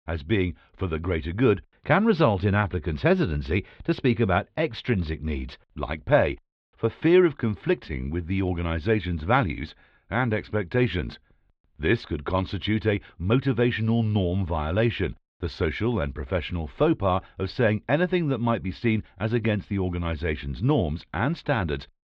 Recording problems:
muffled; slightly; fading above 4 kHz

